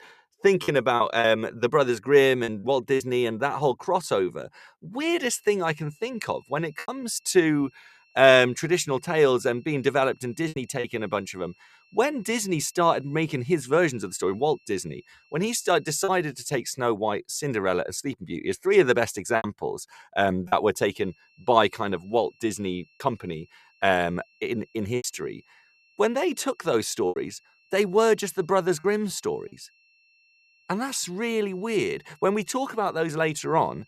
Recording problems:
high-pitched whine; faint; from 5.5 to 16 s and from 21 s on; 2.5 kHz, 35 dB below the speech
choppy; occasionally; 3% of the speech affected

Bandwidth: 14 kHz